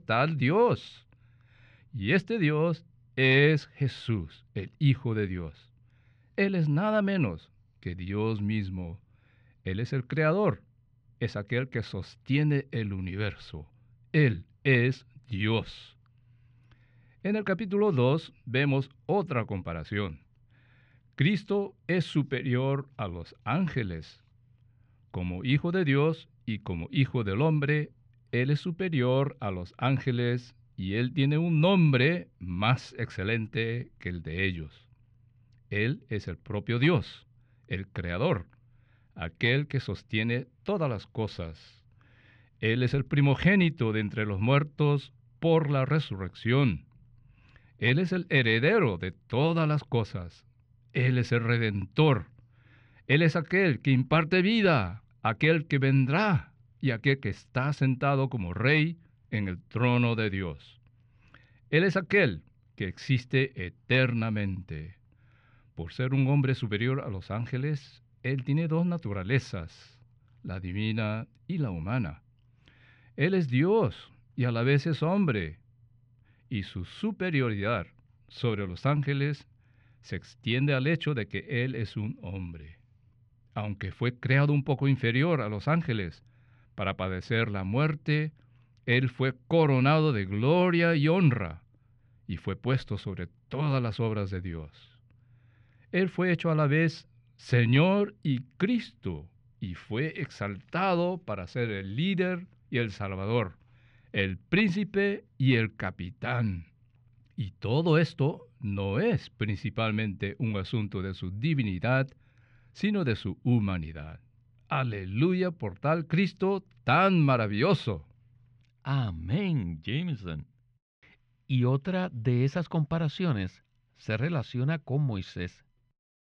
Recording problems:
muffled; slightly; fading above 2.5 kHz

